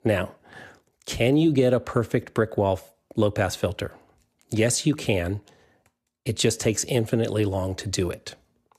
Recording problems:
none

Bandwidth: 14.5 kHz